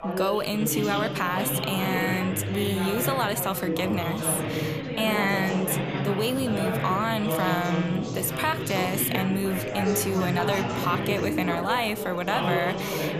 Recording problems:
chatter from many people; loud; throughout; 2 dB below the speech

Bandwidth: 14.5 kHz